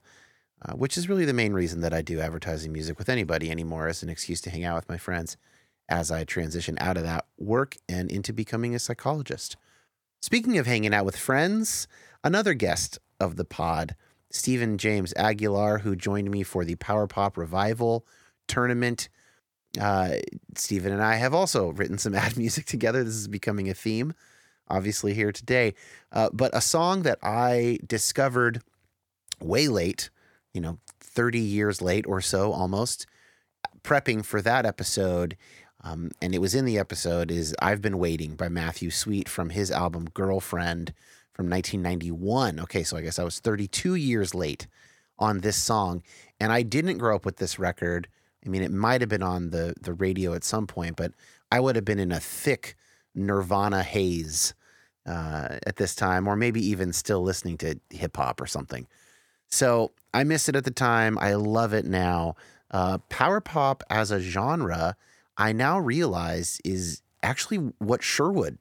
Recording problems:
none

